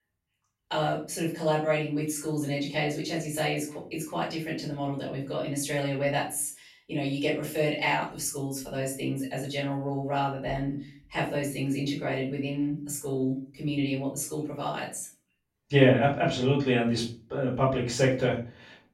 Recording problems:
off-mic speech; far
room echo; slight; dies away in 0.3 s

